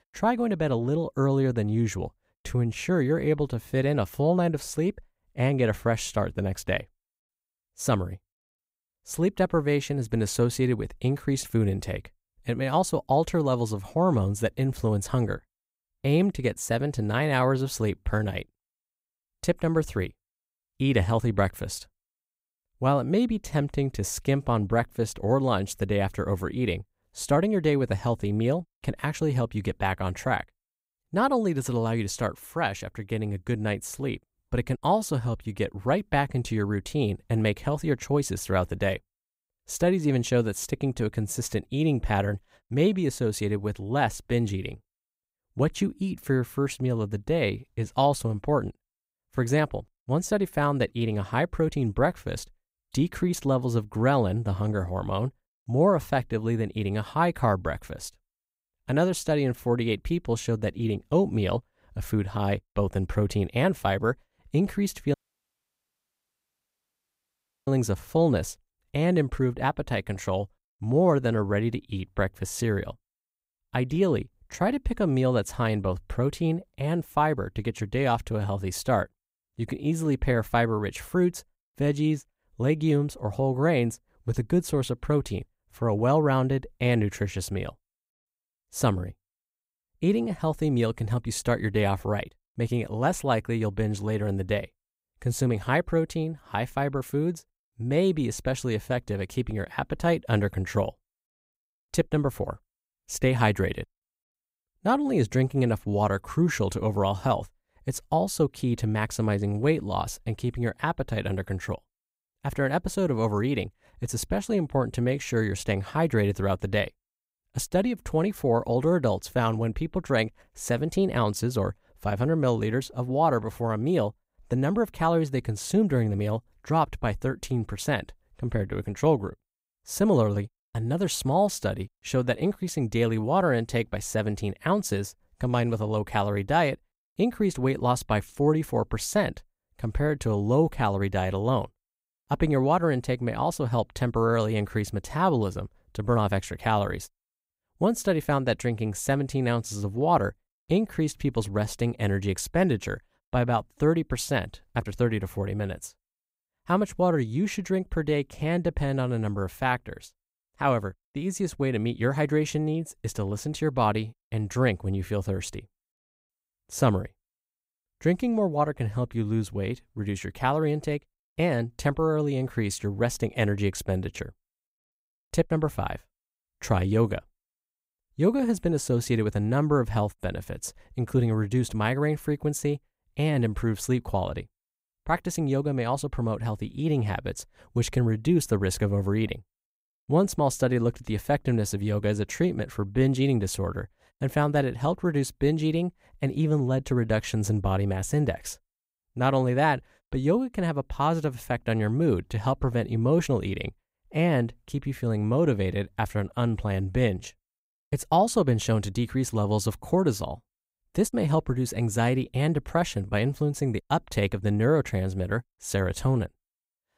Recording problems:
audio cutting out; at 1:05 for 2.5 s

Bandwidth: 15.5 kHz